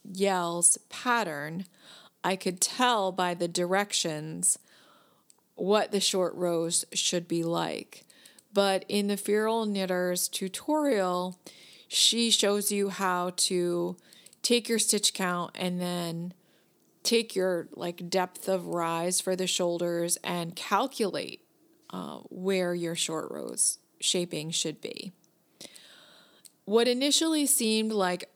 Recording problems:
none

